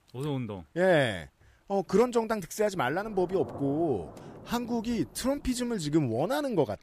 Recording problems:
rain or running water; noticeable; throughout; 20 dB below the speech

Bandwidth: 15 kHz